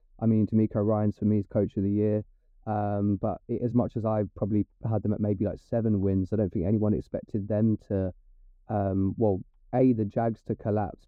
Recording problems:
muffled; very; fading above 1 kHz

